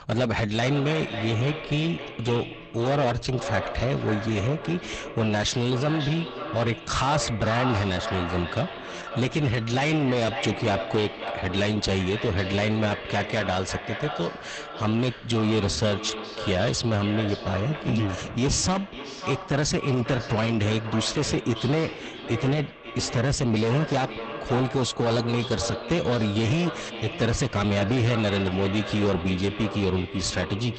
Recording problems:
echo of what is said; strong; throughout; 550 ms later, 9 dB below the speech
garbled, watery; badly; nothing above 8 kHz
distortion; slight; 10 dB below the speech

